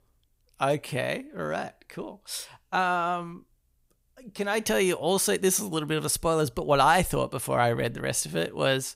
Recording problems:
none

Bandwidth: 15.5 kHz